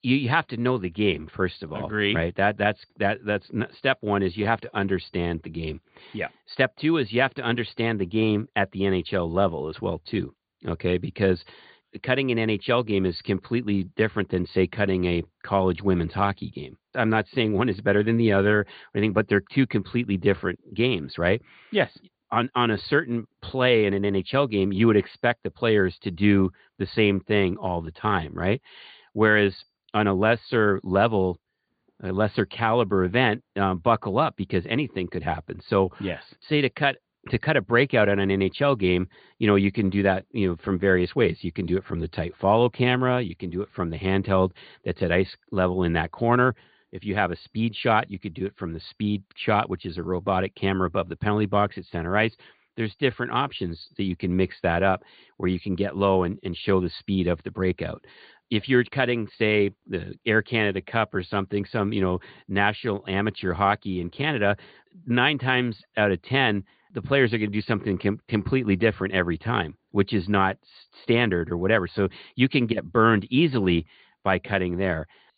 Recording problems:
high frequencies cut off; severe; nothing above 4.5 kHz

